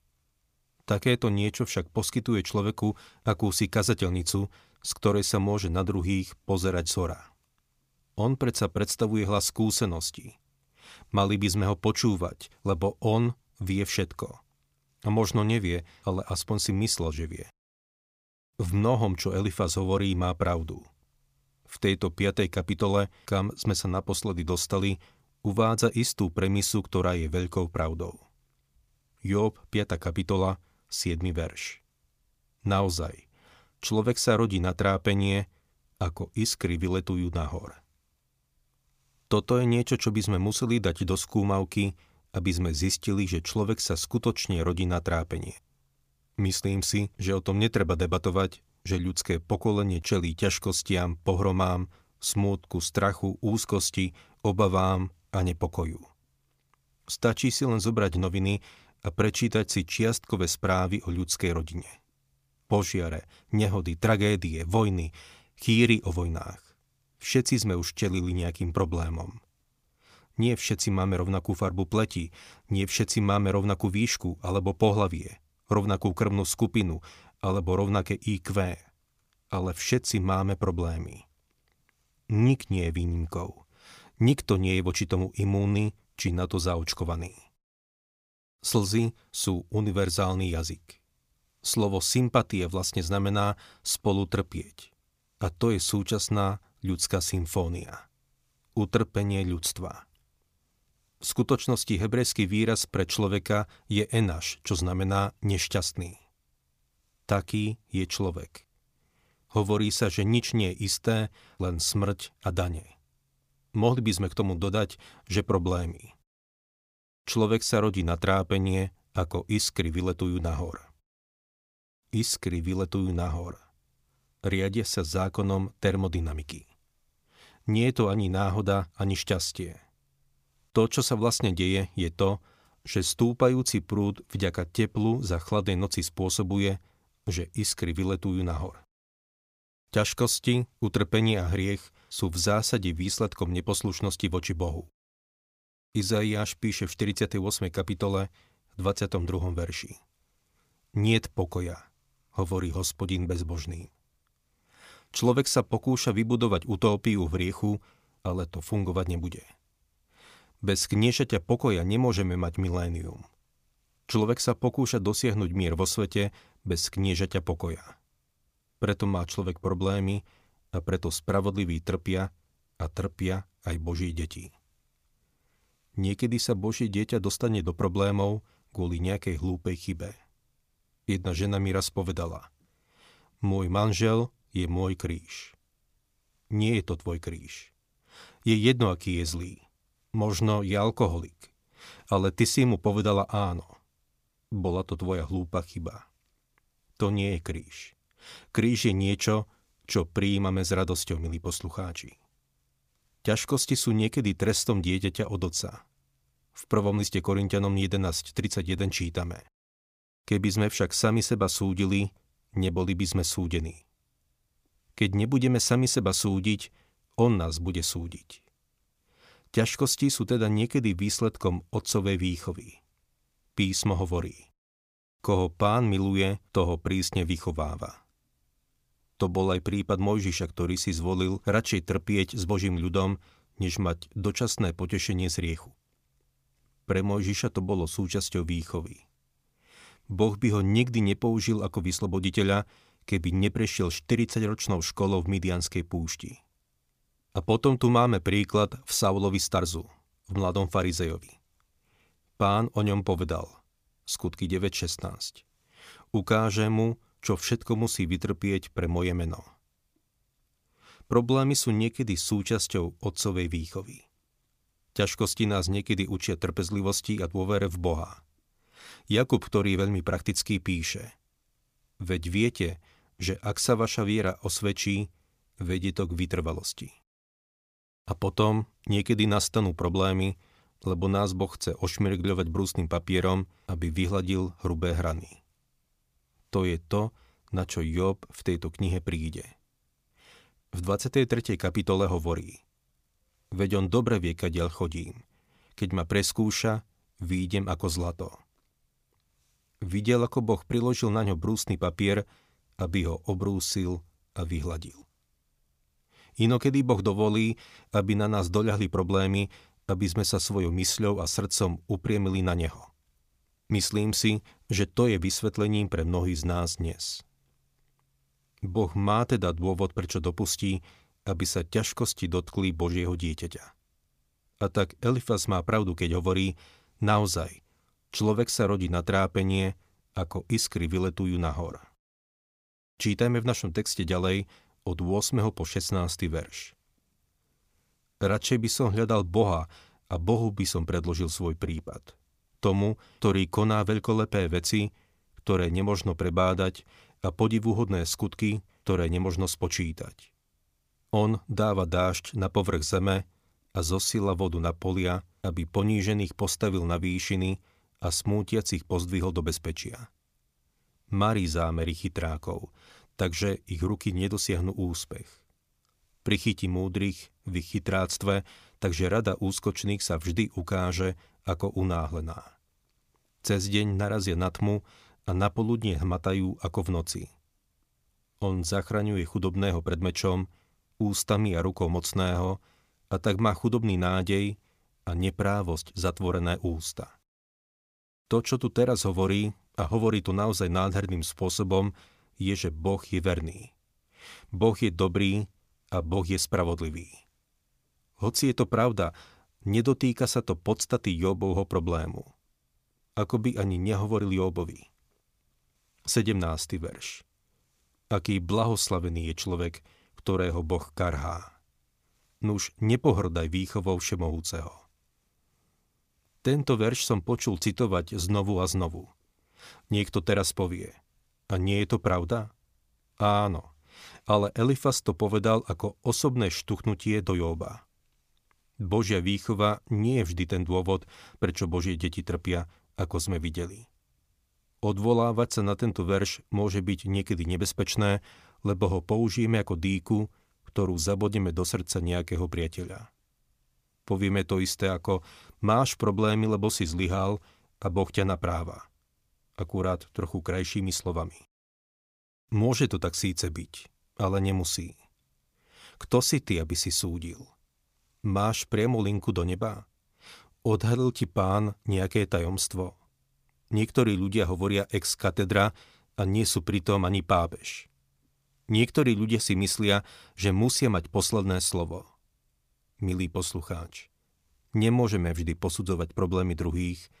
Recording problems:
none

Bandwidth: 15 kHz